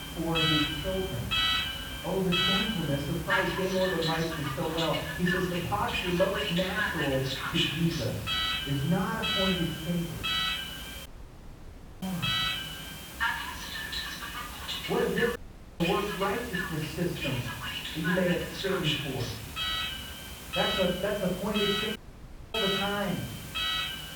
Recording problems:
off-mic speech; far
muffled; very; fading above 2.5 kHz
room echo; slight; dies away in 0.6 s
alarms or sirens; very loud; throughout; as loud as the speech
hiss; noticeable; throughout; 10 dB below the speech
audio cutting out; at 11 s for 1 s, at 15 s and at 22 s for 0.5 s

